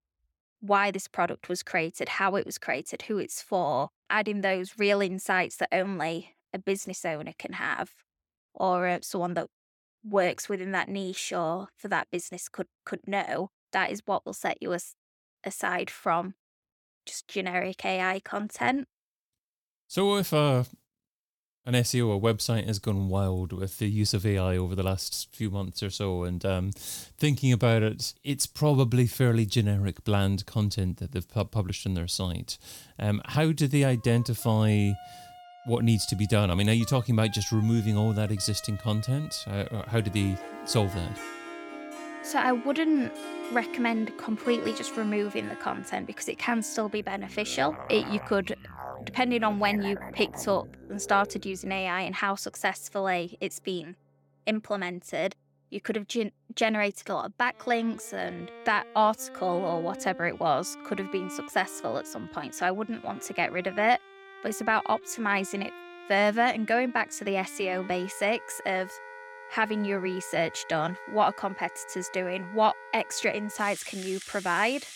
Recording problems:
background music; noticeable; from 34 s on; 15 dB below the speech

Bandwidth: 18 kHz